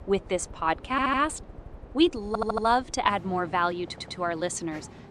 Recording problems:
train or aircraft noise; noticeable; throughout; 20 dB below the speech
audio stuttering; at 1 s, at 2.5 s and at 4 s

